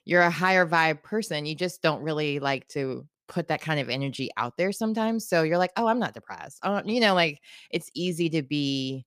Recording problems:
none

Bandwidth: 15 kHz